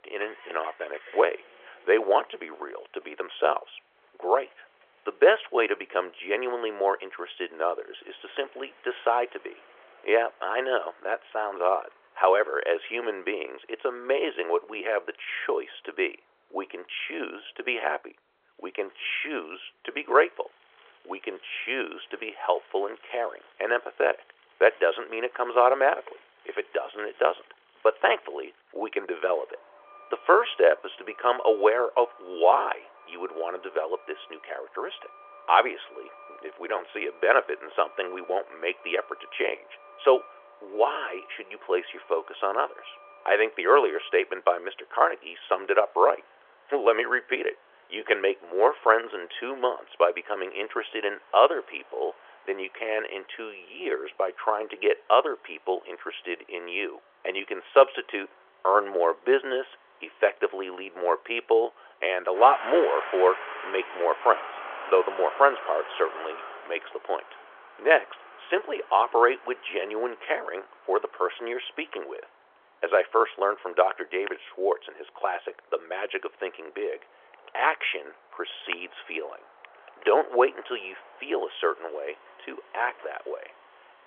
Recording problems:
phone-call audio; nothing above 3.5 kHz
traffic noise; noticeable; throughout; 20 dB below the speech

